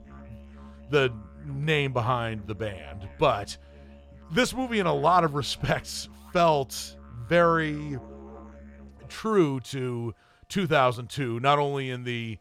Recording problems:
background music; faint; throughout; 20 dB below the speech

